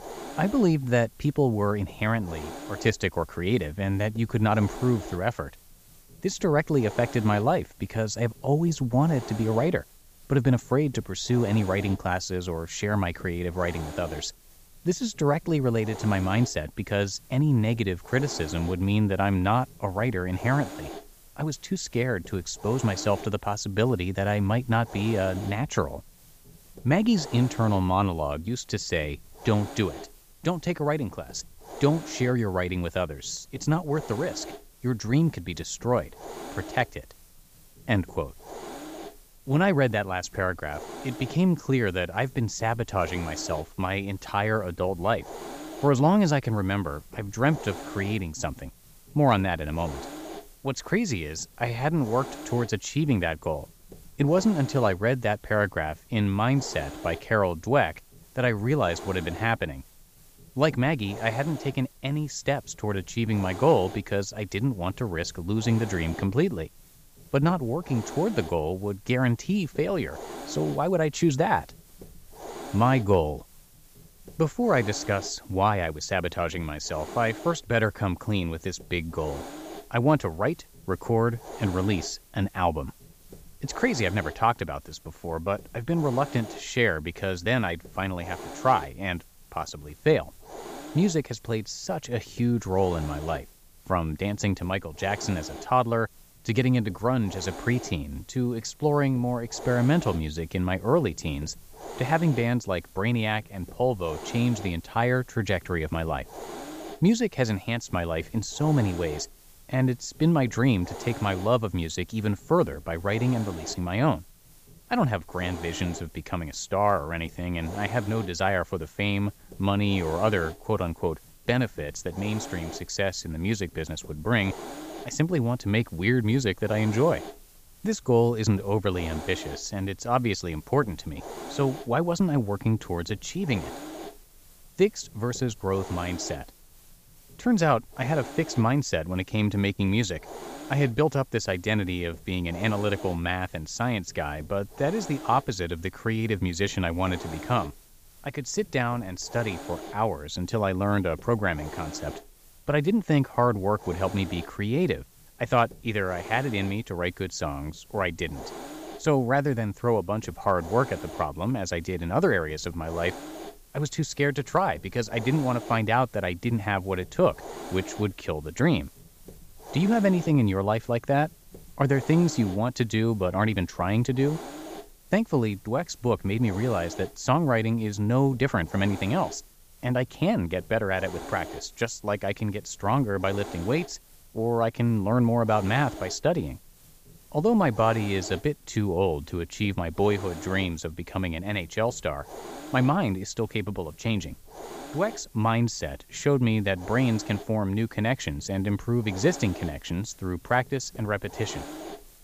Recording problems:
high frequencies cut off; noticeable; nothing above 7.5 kHz
hiss; noticeable; throughout; 15 dB below the speech

